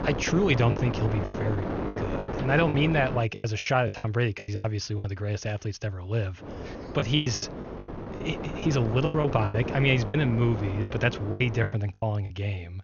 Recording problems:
garbled, watery; slightly; nothing above 6.5 kHz
wind noise on the microphone; heavy; until 3 s and from 6.5 to 12 s; 7 dB below the speech
choppy; very; 13% of the speech affected

